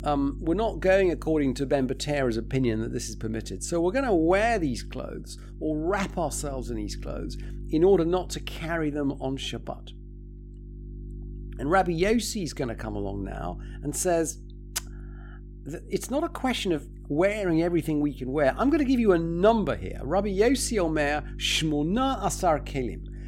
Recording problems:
electrical hum; faint; throughout; 50 Hz, 25 dB below the speech

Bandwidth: 16 kHz